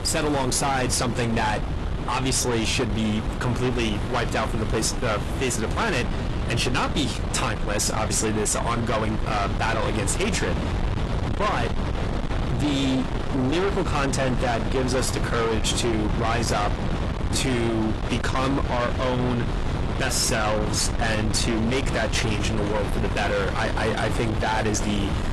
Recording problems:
distortion; heavy; 8 dB below the speech
garbled, watery; slightly; nothing above 11.5 kHz
wind noise on the microphone; heavy; 7 dB below the speech
rain or running water; faint; throughout; 20 dB below the speech

